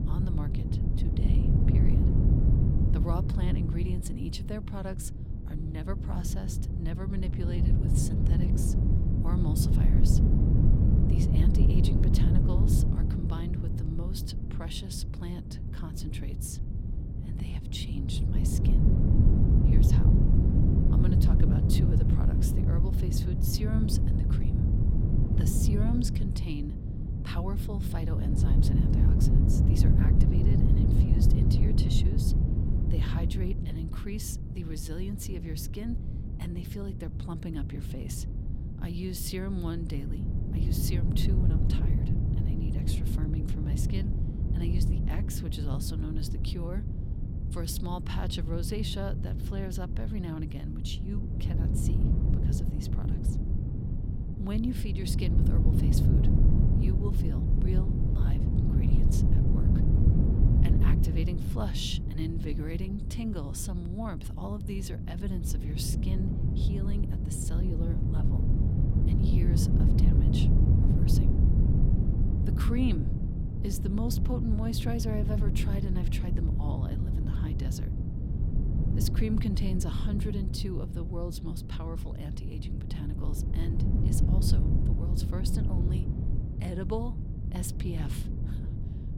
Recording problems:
wind noise on the microphone; heavy; 1 dB above the speech

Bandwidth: 16.5 kHz